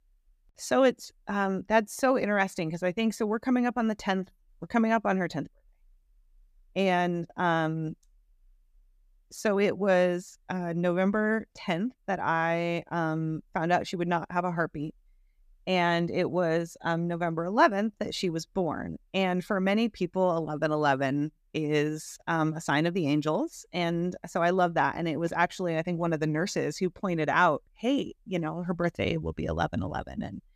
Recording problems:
none

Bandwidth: 14.5 kHz